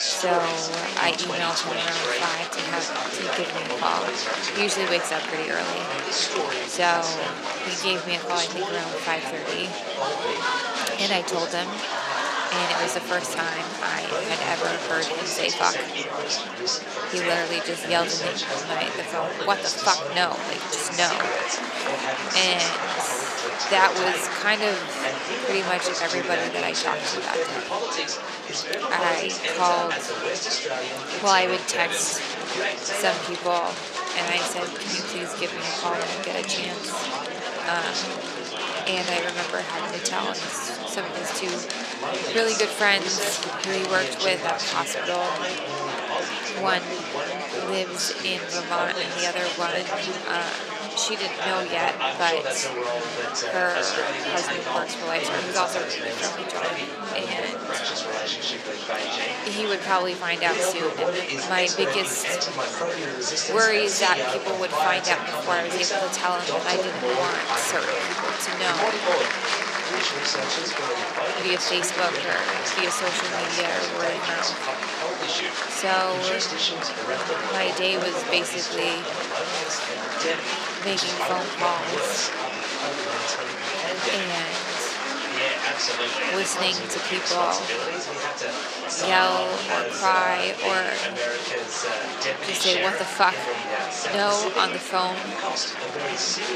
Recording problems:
thin; very; fading below 450 Hz
murmuring crowd; very loud; throughout; as loud as the speech

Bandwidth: 14.5 kHz